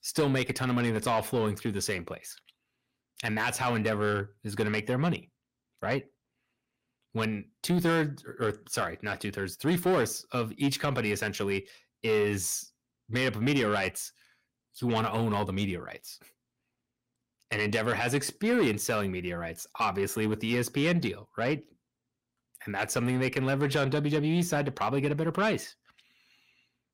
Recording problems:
distortion; slight; 10 dB below the speech

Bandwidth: 16 kHz